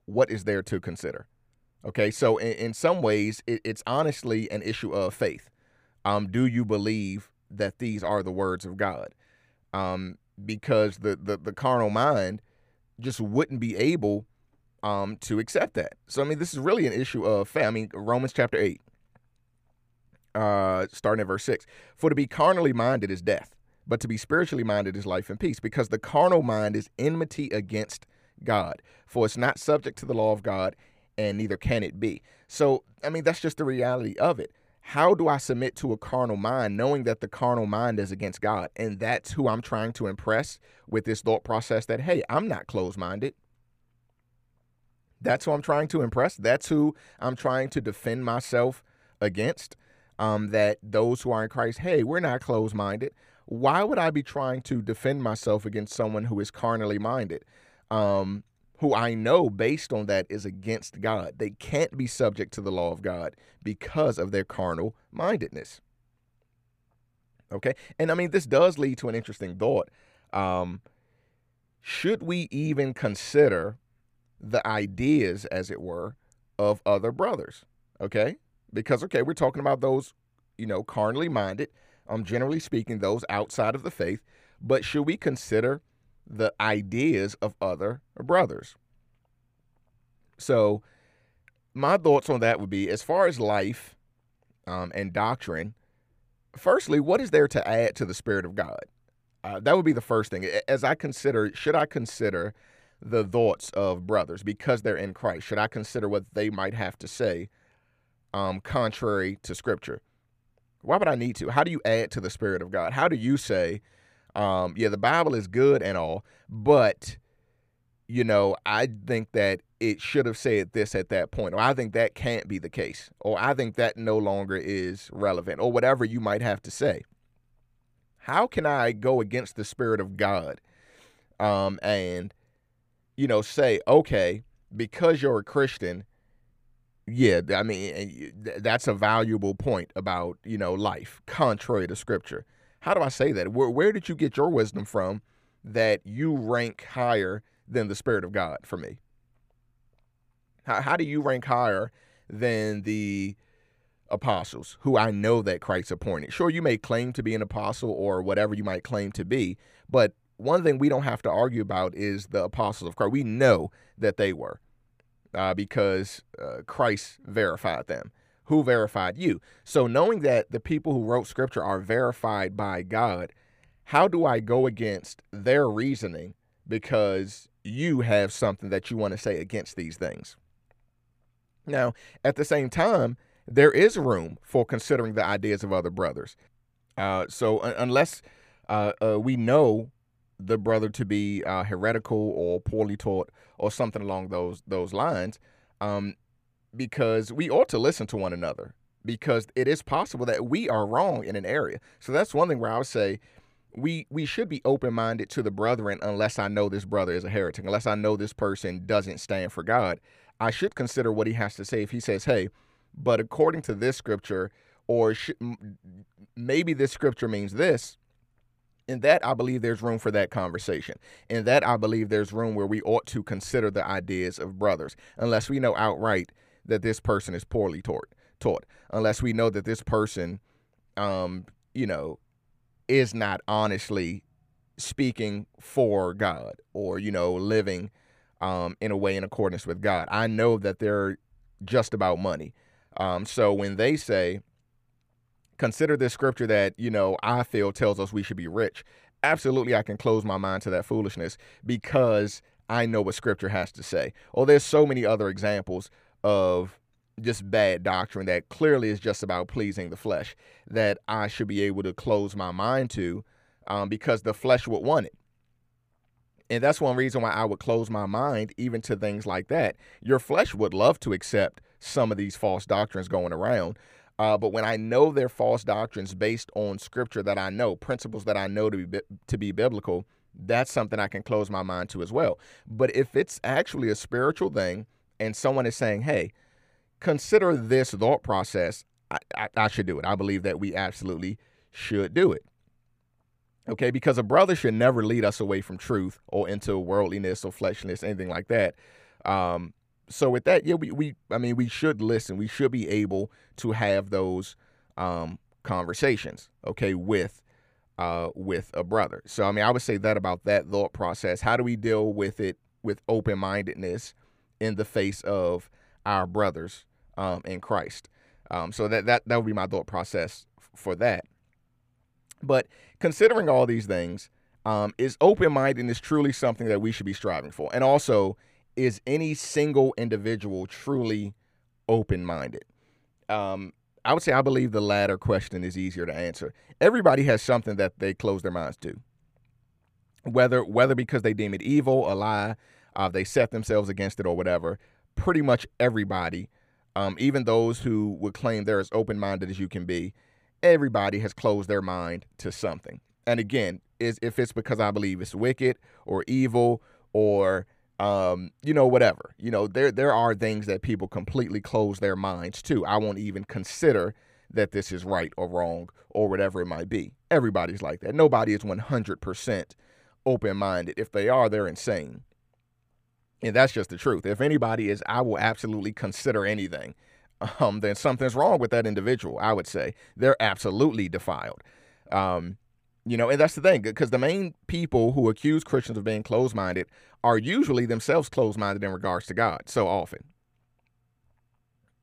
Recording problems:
muffled; slightly; fading above 2.5 kHz

